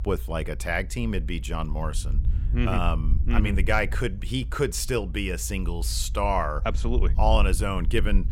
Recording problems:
low rumble; faint; throughout; 20 dB below the speech

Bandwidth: 16 kHz